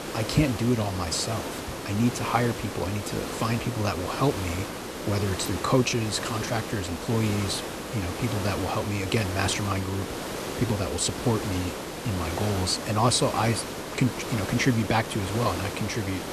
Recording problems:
hiss; loud; throughout; 6 dB below the speech

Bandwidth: 13.5 kHz